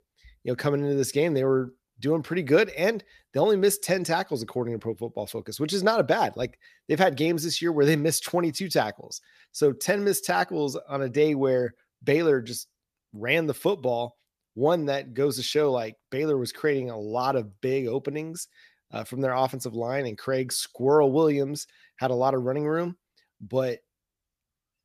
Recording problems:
none

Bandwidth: 14.5 kHz